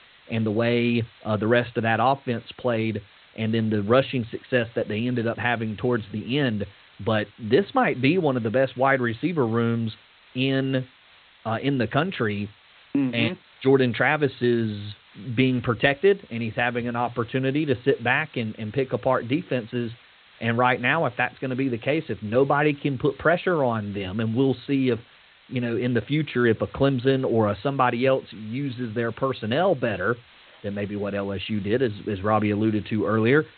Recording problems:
high frequencies cut off; severe; nothing above 4 kHz
hiss; faint; throughout; 25 dB below the speech

